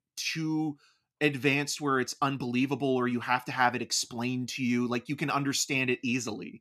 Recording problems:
none

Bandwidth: 14.5 kHz